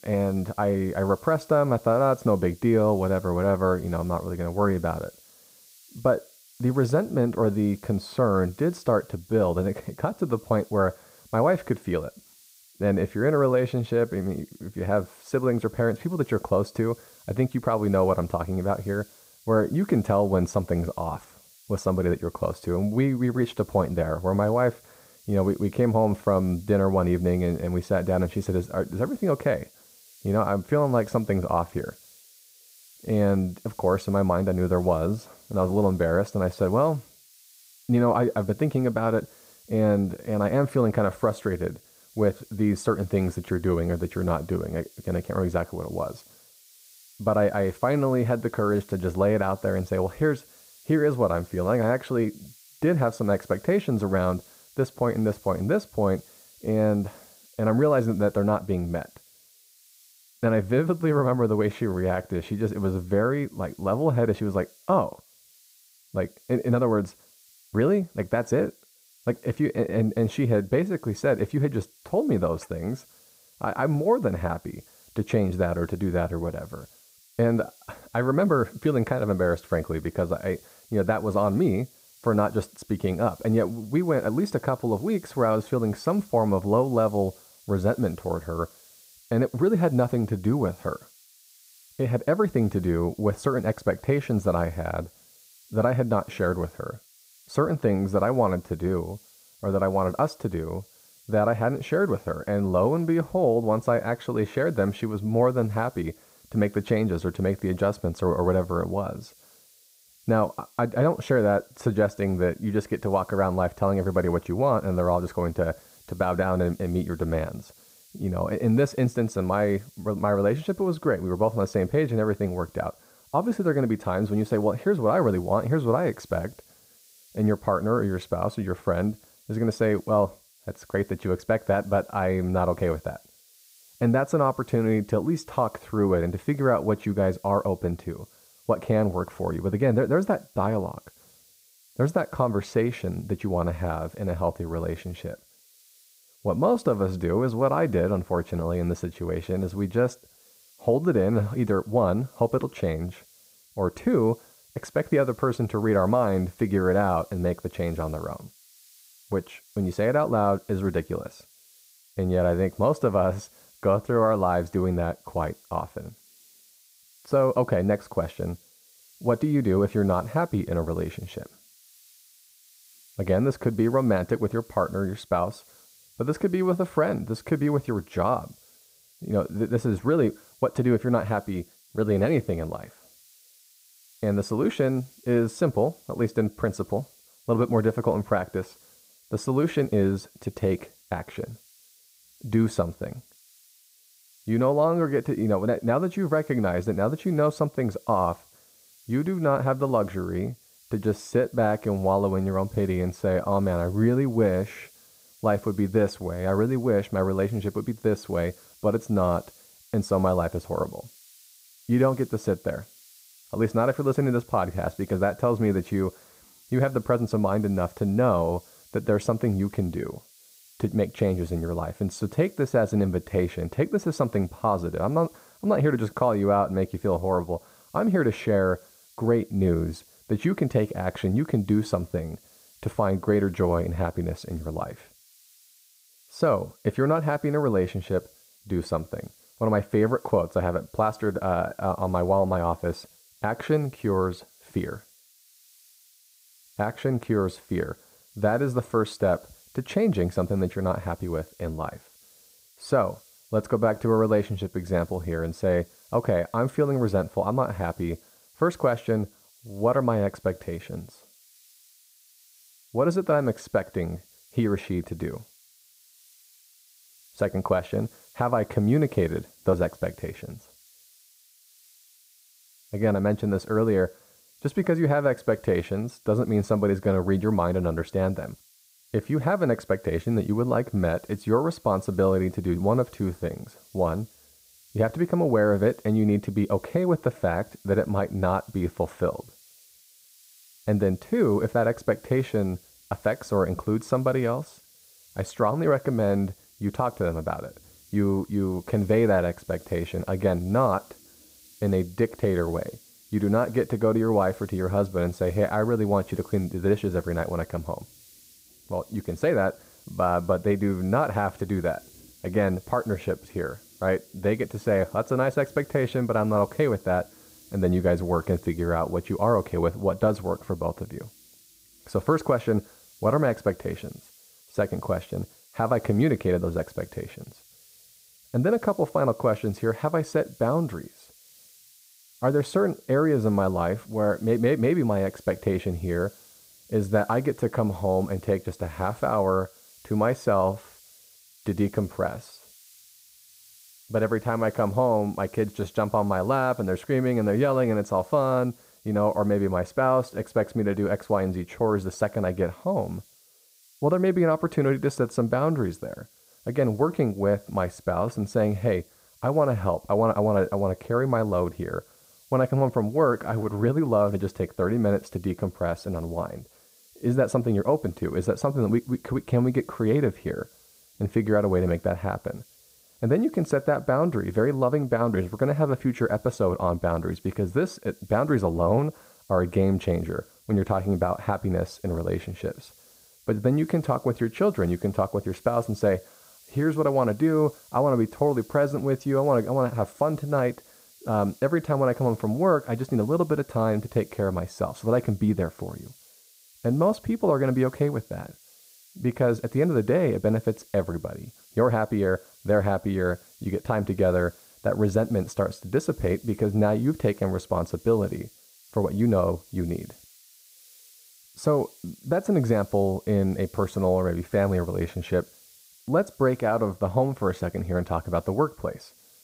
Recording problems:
muffled; very; fading above 2 kHz
hiss; faint; throughout; 25 dB below the speech

